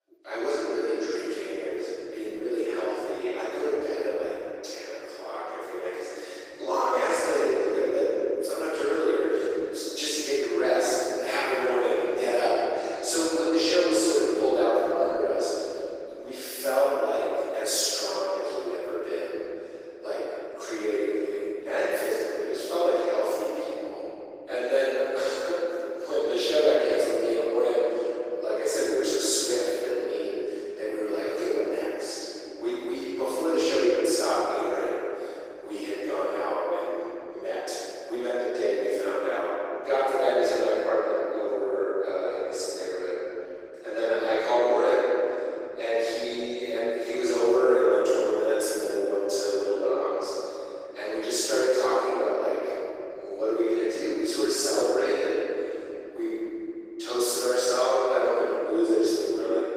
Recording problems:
room echo; strong; dies away in 3 s
off-mic speech; far
thin; very; fading below 300 Hz
garbled, watery; slightly; nothing above 15.5 kHz

